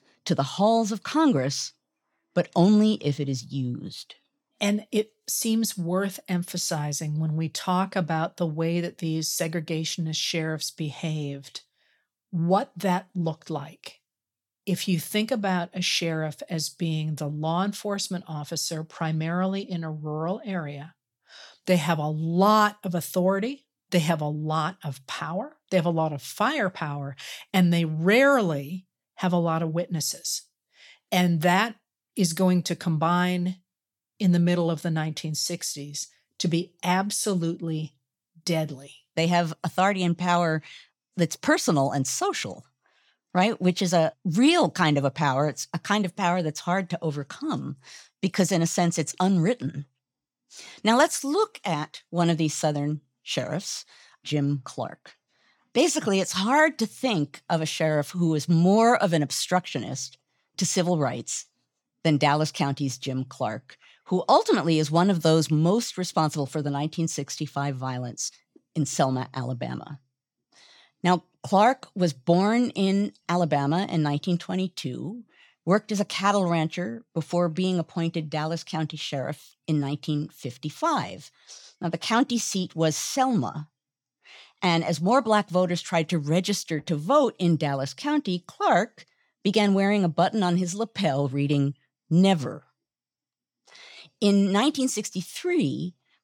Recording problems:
none

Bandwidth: 17 kHz